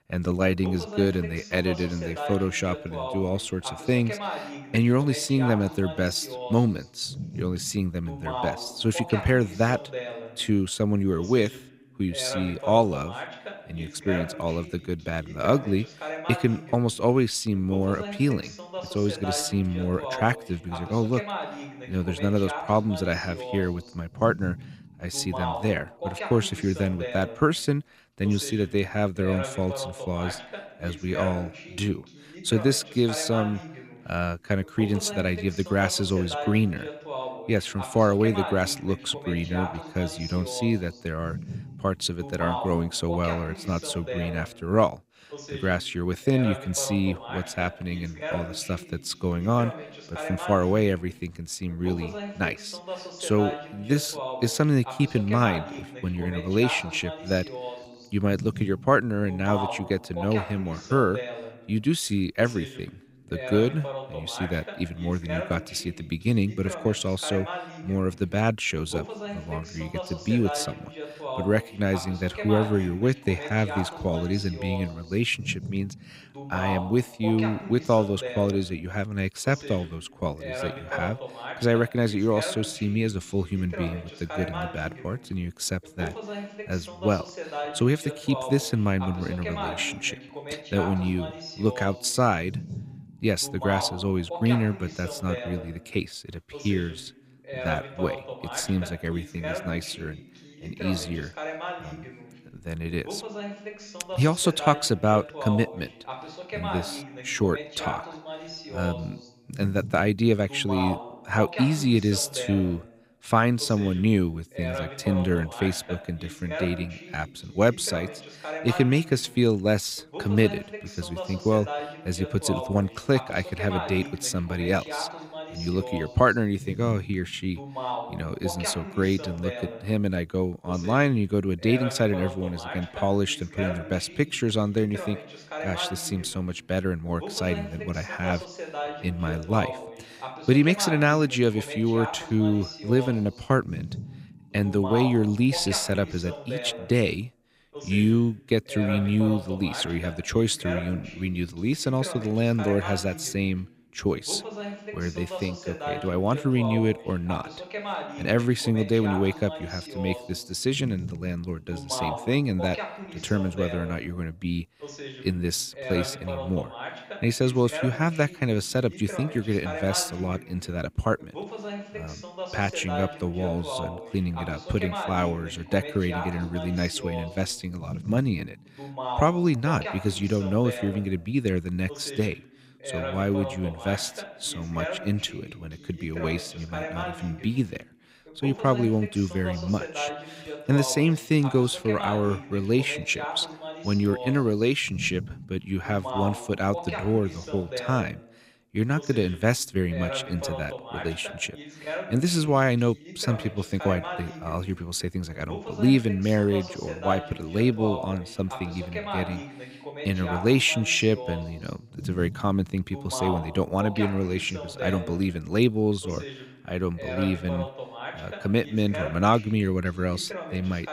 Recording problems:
voice in the background; loud; throughout; 10 dB below the speech

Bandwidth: 15.5 kHz